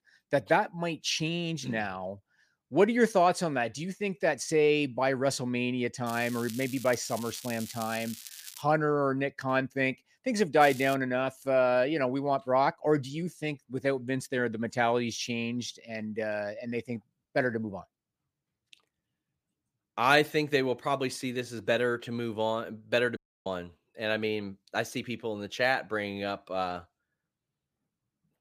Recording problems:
crackling; noticeable; from 6 to 8.5 s and at 11 s; 15 dB below the speech
audio cutting out; at 23 s

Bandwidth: 15 kHz